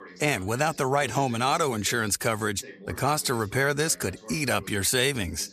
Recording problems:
voice in the background; faint; throughout; 20 dB below the speech

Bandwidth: 14.5 kHz